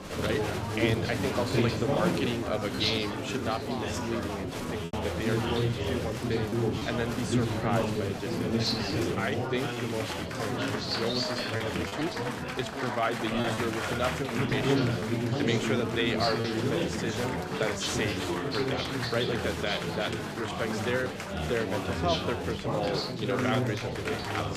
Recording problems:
chatter from many people; very loud; throughout; 3 dB above the speech
choppy; occasionally; 2% of the speech affected

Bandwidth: 14.5 kHz